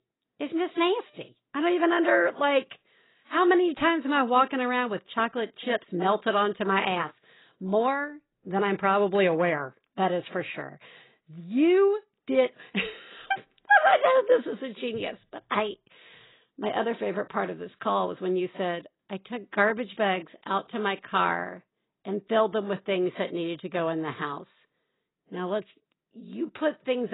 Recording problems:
garbled, watery; badly; nothing above 4 kHz
abrupt cut into speech; at the end

